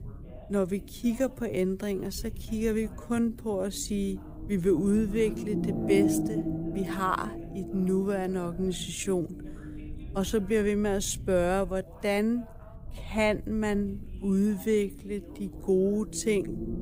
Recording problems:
wrong speed, natural pitch; too slow; 0.6 times normal speed
low rumble; loud; throughout; 8 dB below the speech
voice in the background; faint; throughout; 25 dB below the speech

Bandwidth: 15.5 kHz